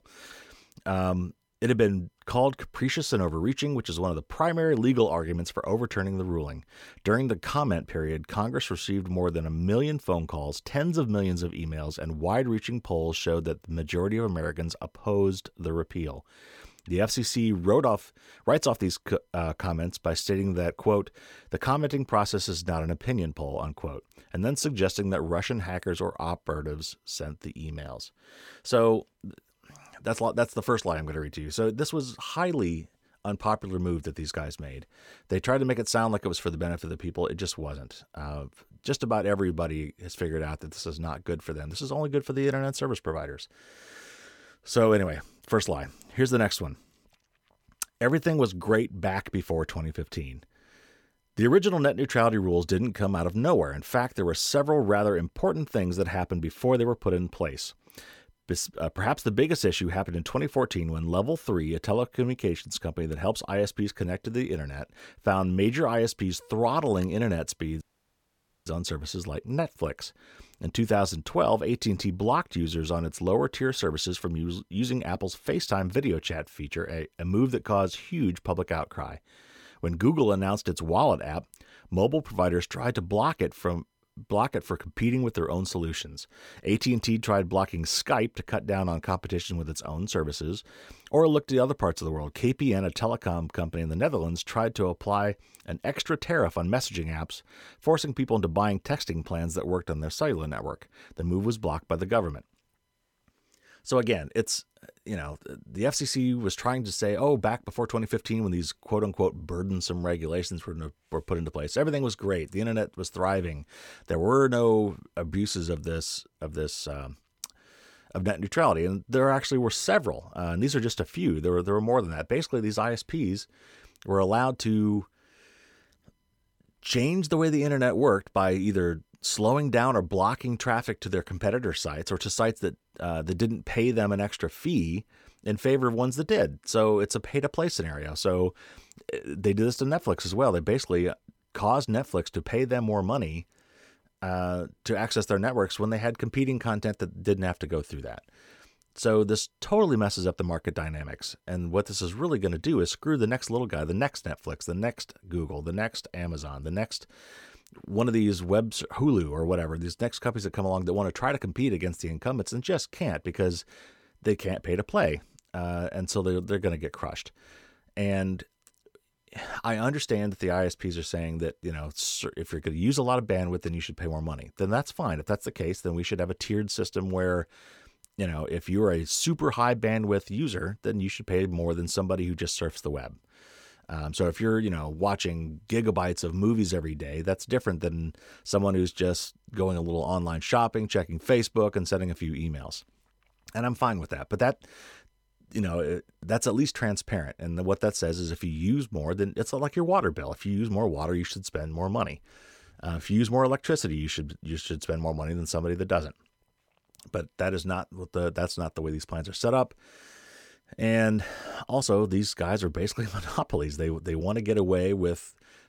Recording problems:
audio cutting out; at 1:08 for 1 s

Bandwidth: 17.5 kHz